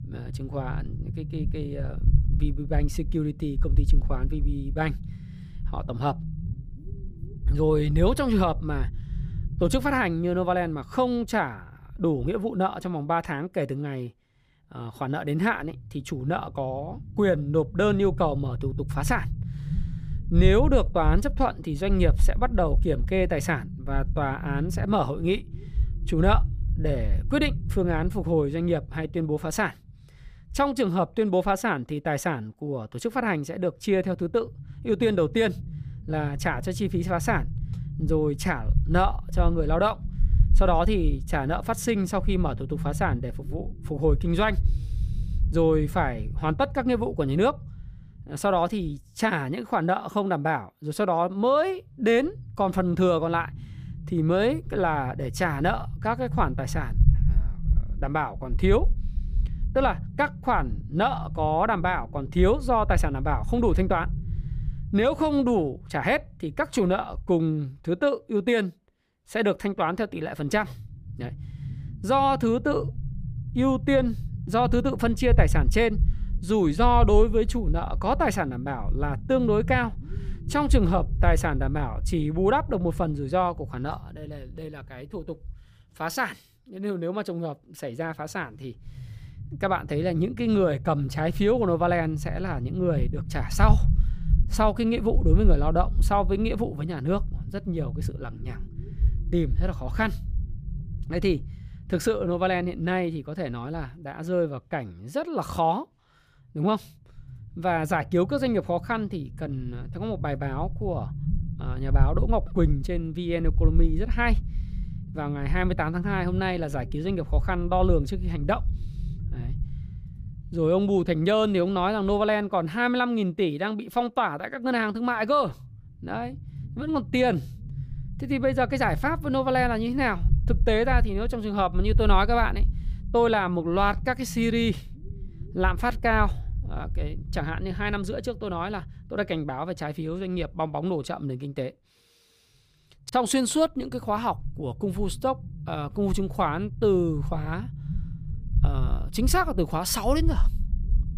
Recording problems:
low rumble; noticeable; throughout; 20 dB below the speech

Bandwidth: 15 kHz